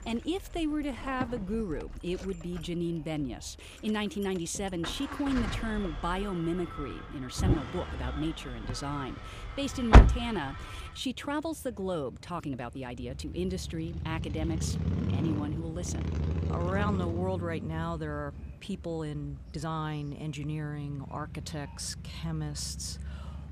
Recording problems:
traffic noise; very loud; throughout; 3 dB above the speech
chatter from many people; faint; throughout; 30 dB below the speech
uneven, jittery; strongly; from 0.5 to 23 s

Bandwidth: 15 kHz